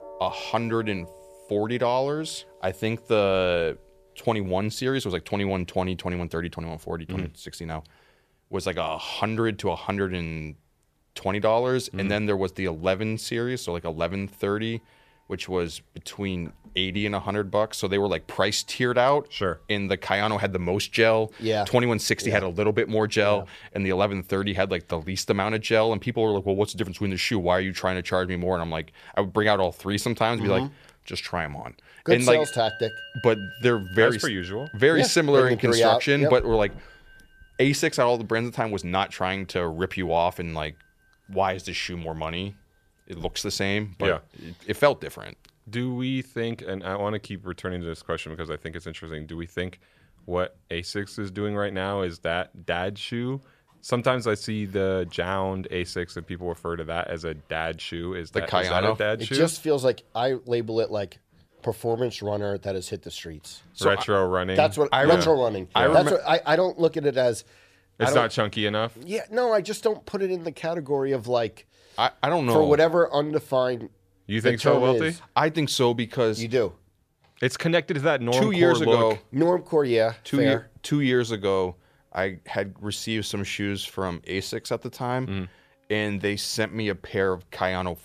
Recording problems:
background music; faint; throughout; 20 dB below the speech

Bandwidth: 14.5 kHz